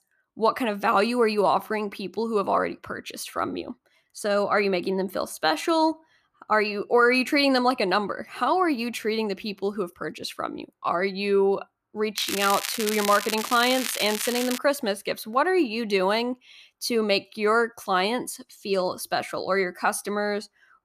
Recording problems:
crackling; loud; from 12 to 15 s; 5 dB below the speech

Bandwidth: 14.5 kHz